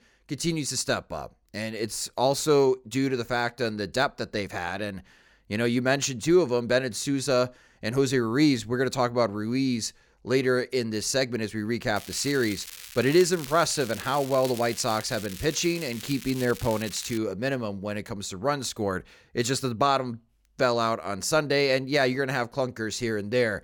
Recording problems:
crackling; noticeable; from 12 to 17 s; 15 dB below the speech

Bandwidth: 18 kHz